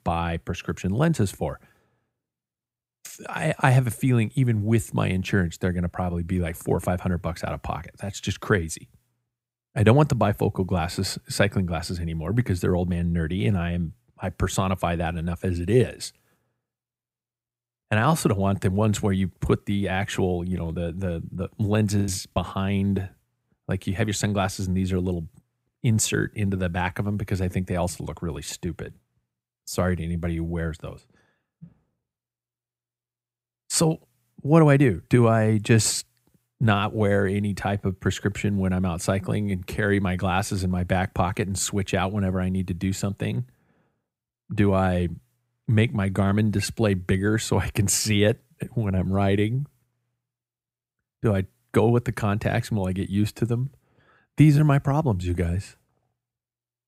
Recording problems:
choppy; very; at 22 s; 10% of the speech affected

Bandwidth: 15.5 kHz